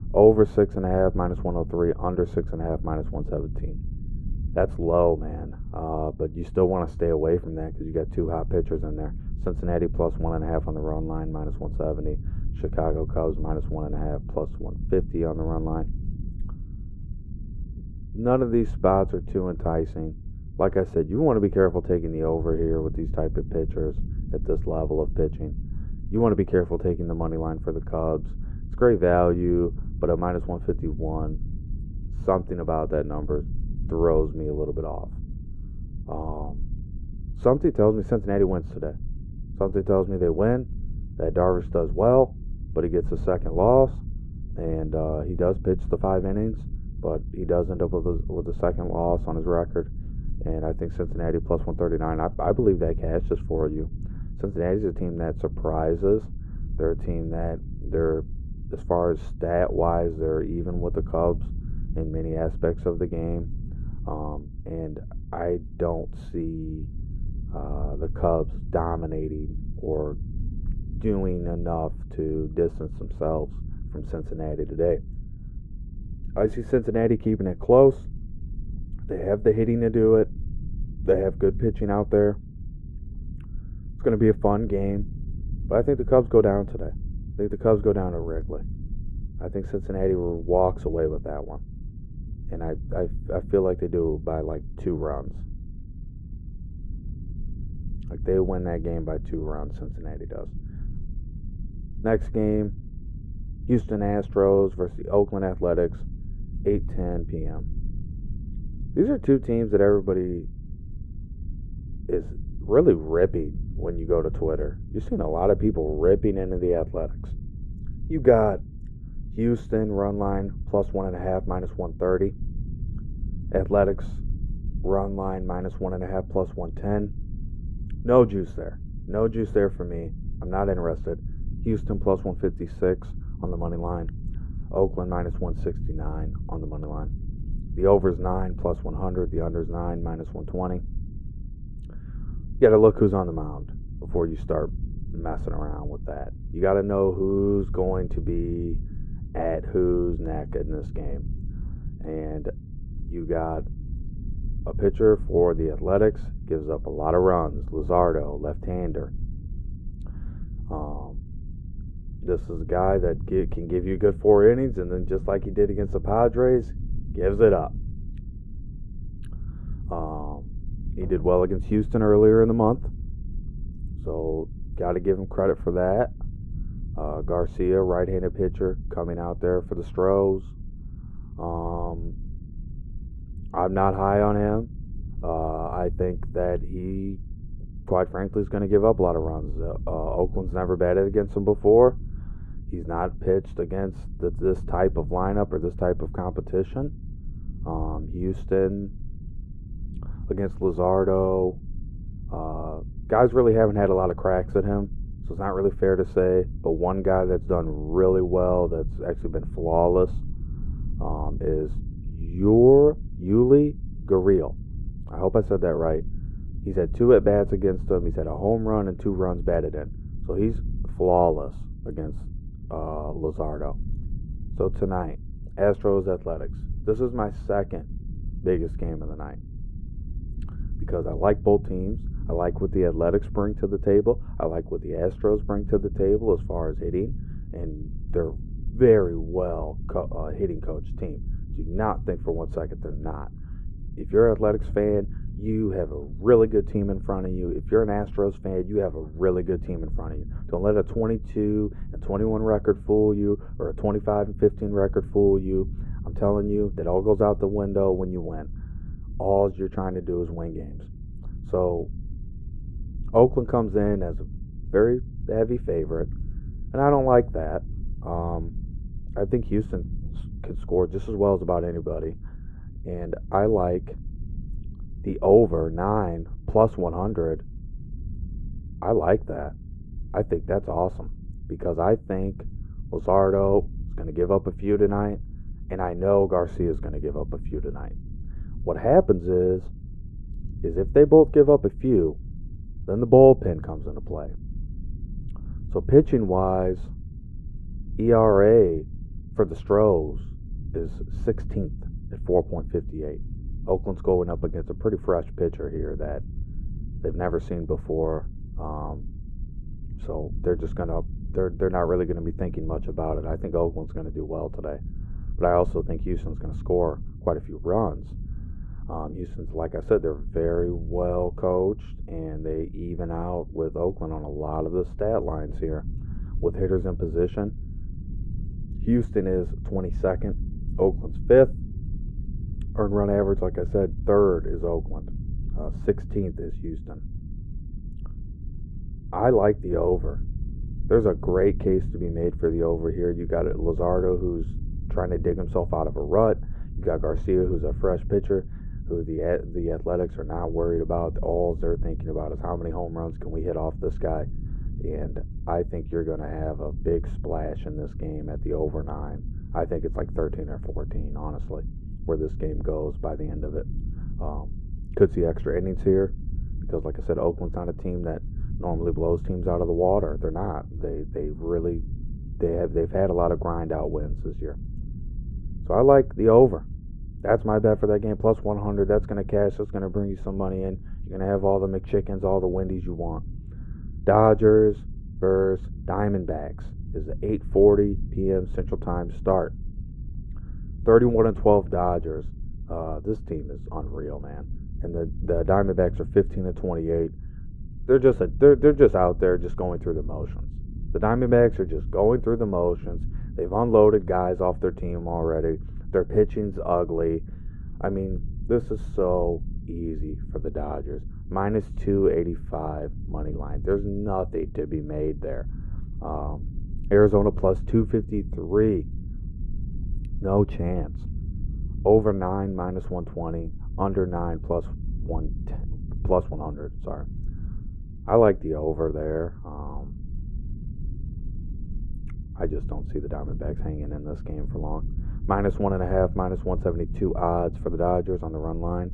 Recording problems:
muffled; very; fading above 2 kHz
low rumble; faint; throughout; 25 dB below the speech

